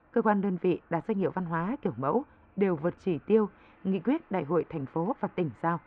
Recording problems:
muffled; very; fading above 2 kHz
train or aircraft noise; faint; throughout; 30 dB below the speech

